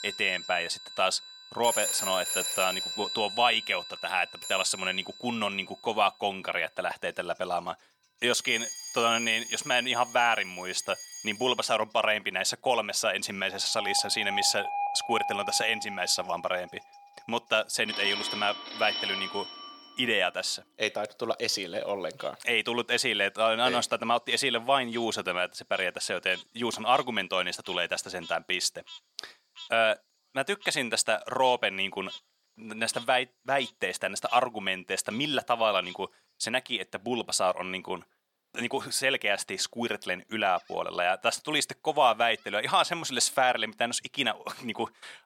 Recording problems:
thin; somewhat; fading below 400 Hz
alarms or sirens; loud; until 20 s; 7 dB below the speech
animal sounds; faint; throughout; 20 dB below the speech

